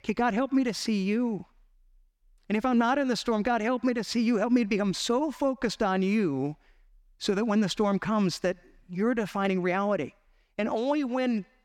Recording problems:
none

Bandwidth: 17 kHz